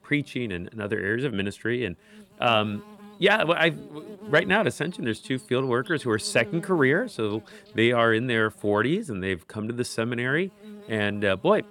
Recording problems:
electrical hum; faint; throughout; 60 Hz, 25 dB below the speech

